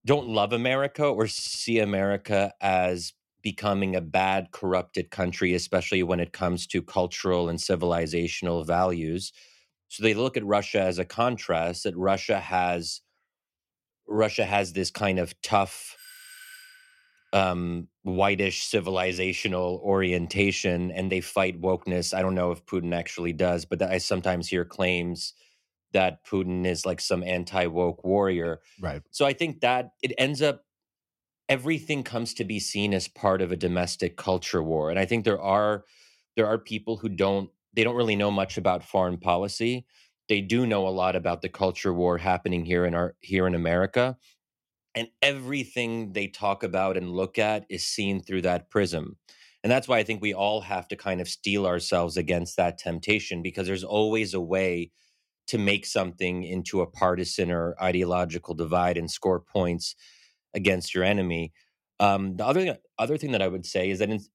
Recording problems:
audio stuttering; at 1.5 s
doorbell; faint; from 16 to 17 s; peak 15 dB below the speech

